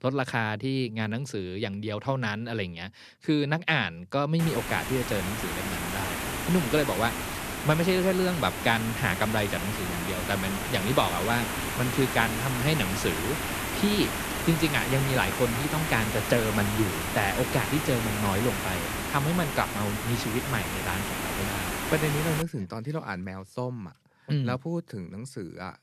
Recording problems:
hiss; loud; from 4.5 to 22 s; 2 dB below the speech

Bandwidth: 14 kHz